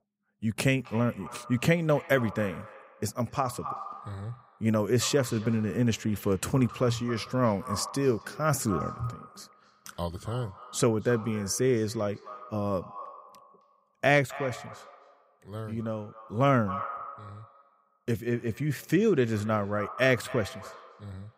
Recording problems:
echo of what is said; noticeable; throughout; 270 ms later, 15 dB below the speech

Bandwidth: 15.5 kHz